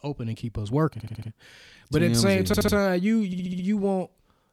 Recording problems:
audio stuttering; at 1 s, at 2.5 s and at 3.5 s

